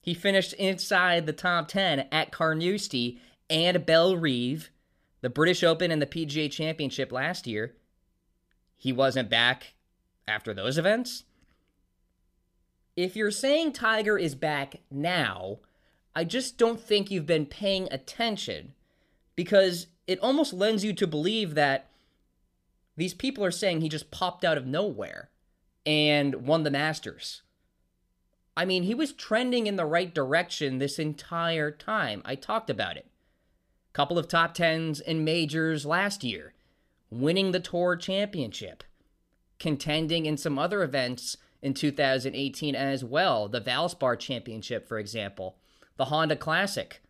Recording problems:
none

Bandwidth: 15 kHz